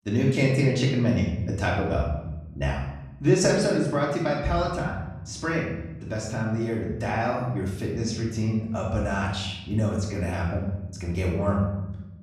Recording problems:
off-mic speech; far
room echo; noticeable; dies away in 0.9 s

